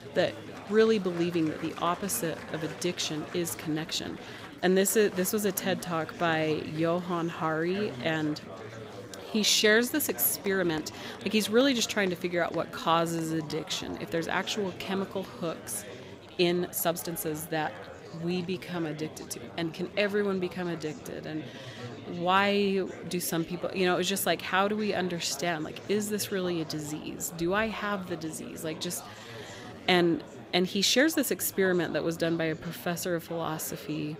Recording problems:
chatter from many people; noticeable; throughout; 15 dB below the speech
uneven, jittery; strongly; from 3.5 to 30 s

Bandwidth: 15.5 kHz